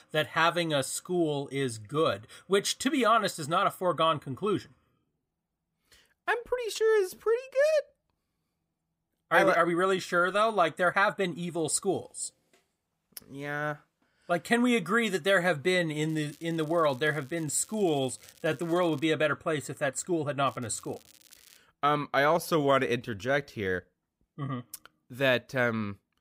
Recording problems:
crackling; faint; from 16 to 19 s and from 20 to 22 s; 25 dB below the speech
uneven, jittery; strongly; from 4 to 24 s

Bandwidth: 15.5 kHz